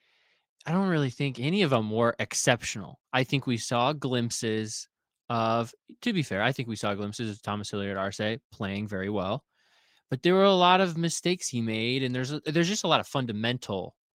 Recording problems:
garbled, watery; slightly; nothing above 16 kHz

